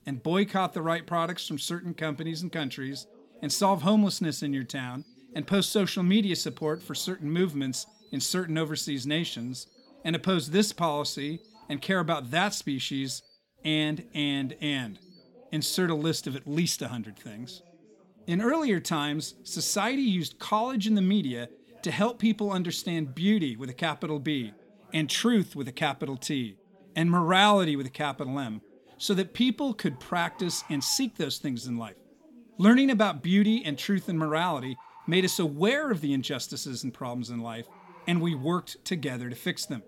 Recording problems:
animal sounds; faint; throughout; 30 dB below the speech
background chatter; faint; throughout; 2 voices, 30 dB below the speech

